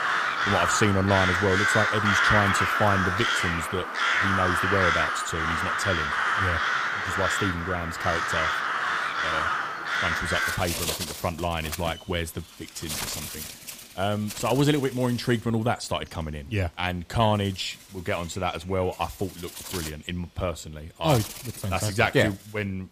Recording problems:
animal sounds; very loud; throughout; 3 dB above the speech

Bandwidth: 15 kHz